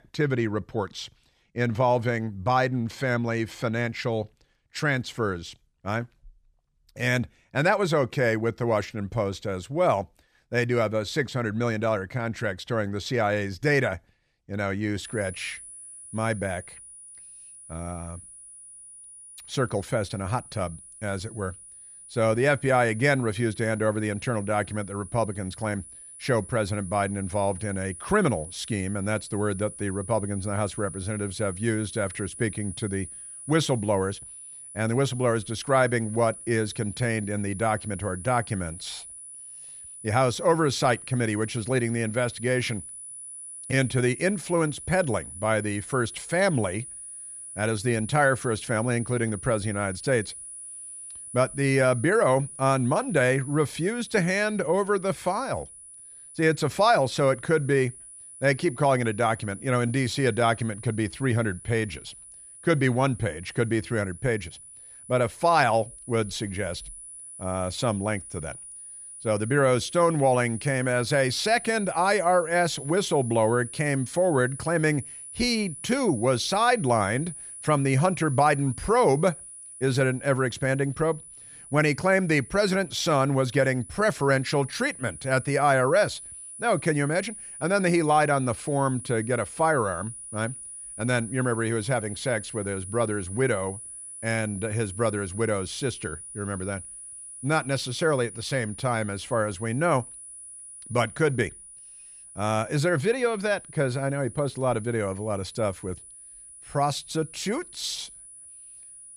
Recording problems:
high-pitched whine; noticeable; from 15 s on; 10 kHz, 15 dB below the speech

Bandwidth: 14.5 kHz